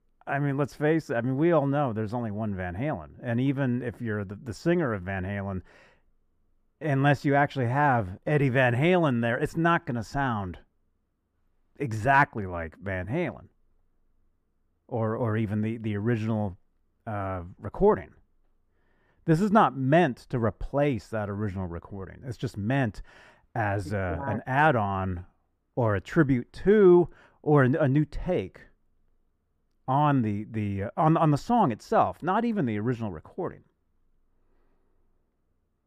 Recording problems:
muffled; slightly; fading above 2.5 kHz

